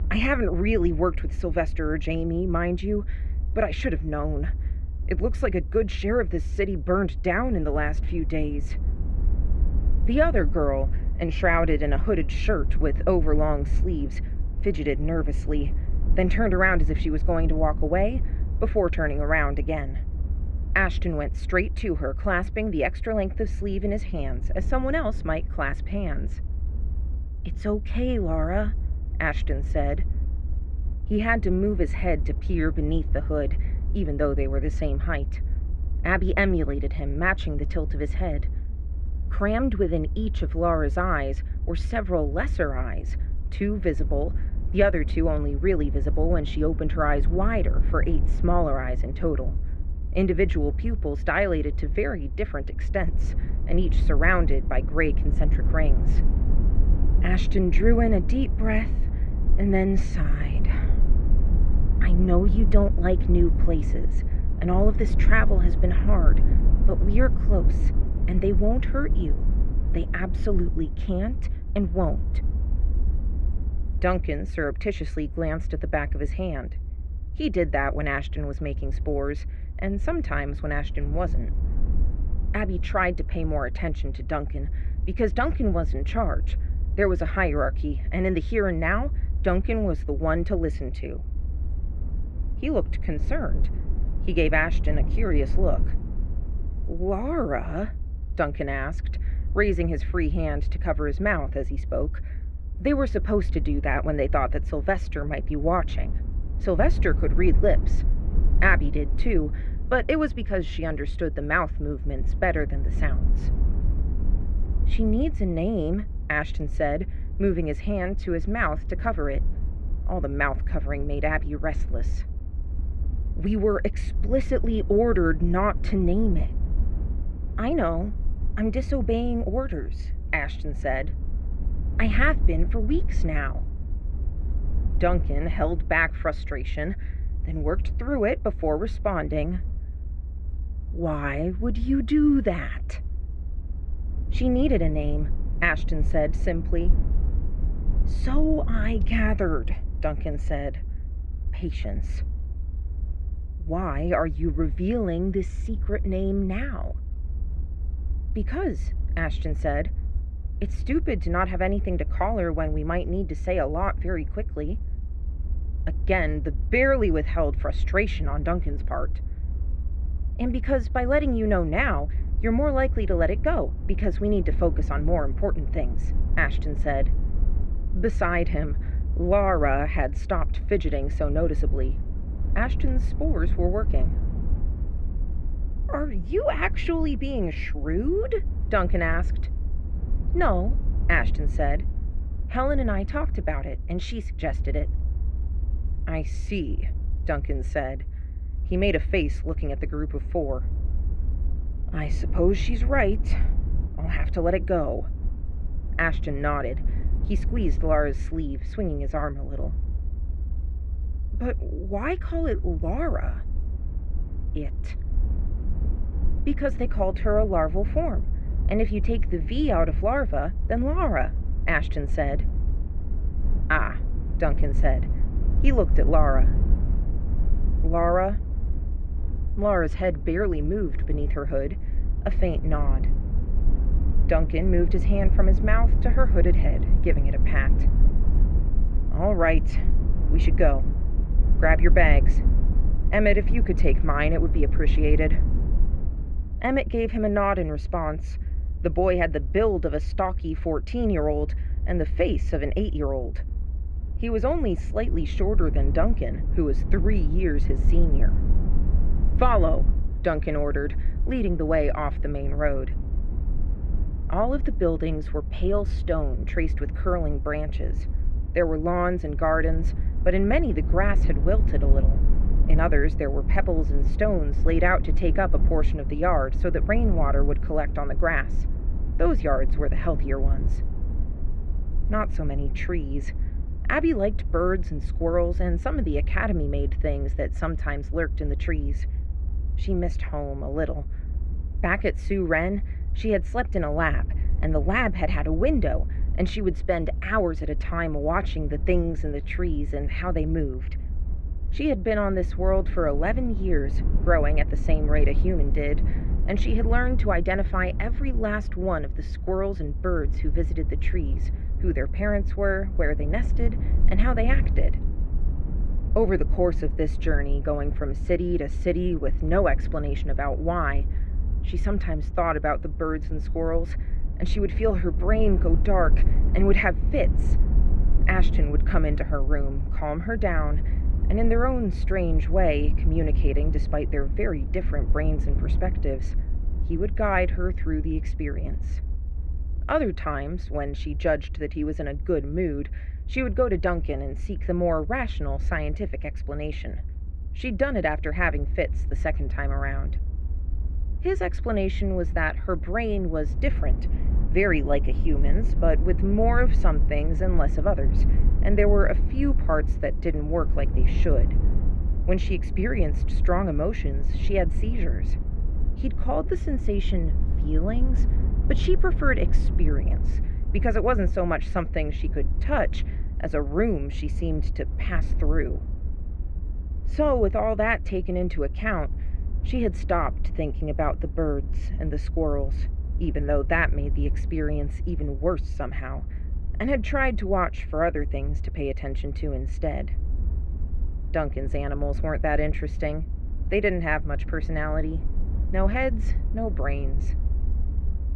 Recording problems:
muffled; very; fading above 2.5 kHz
low rumble; noticeable; throughout; 20 dB below the speech

